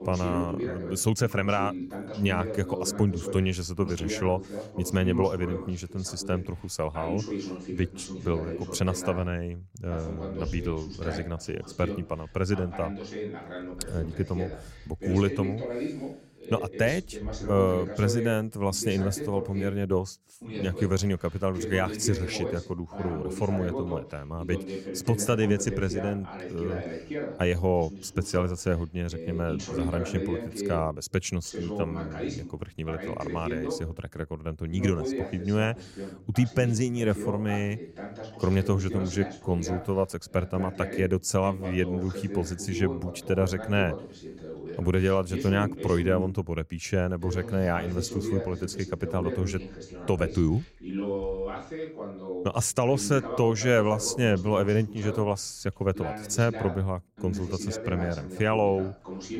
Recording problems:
voice in the background; loud; throughout; 8 dB below the speech

